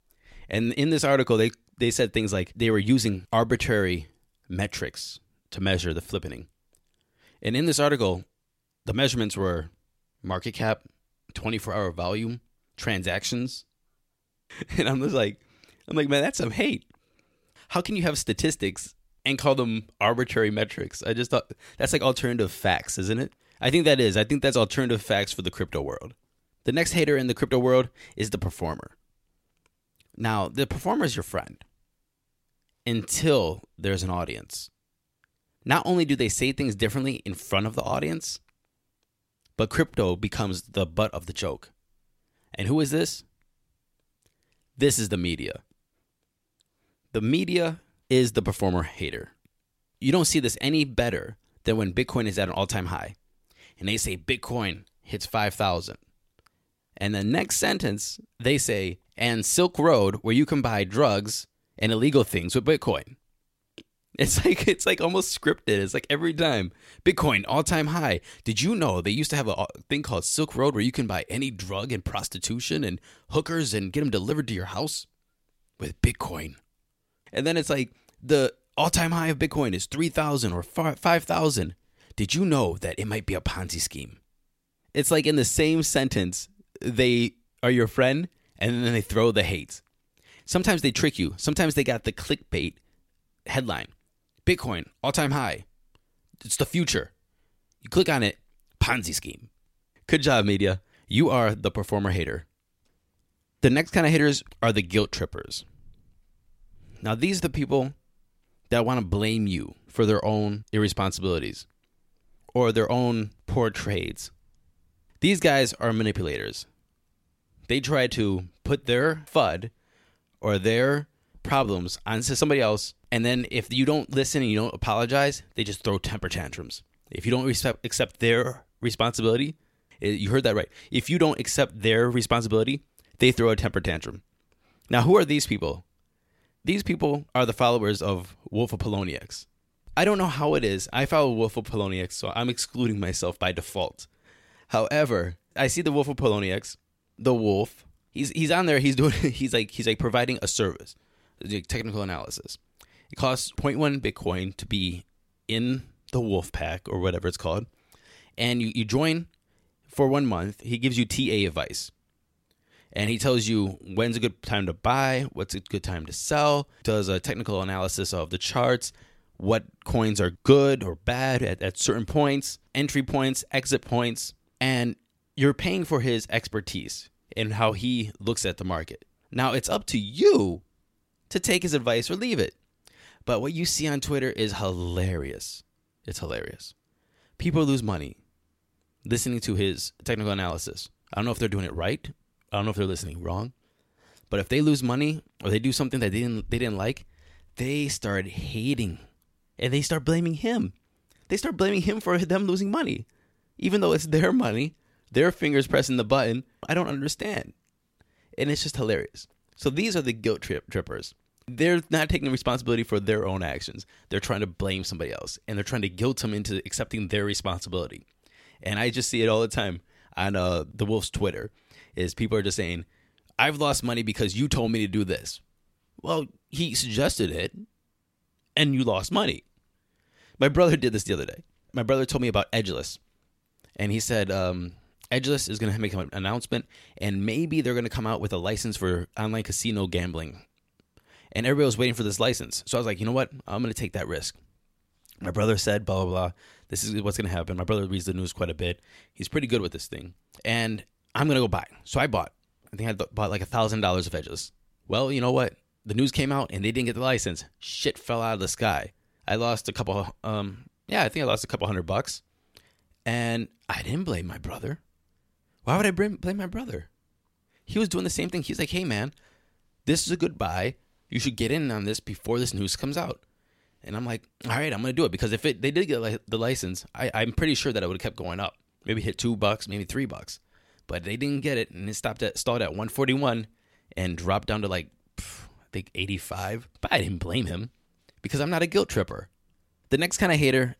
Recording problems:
none

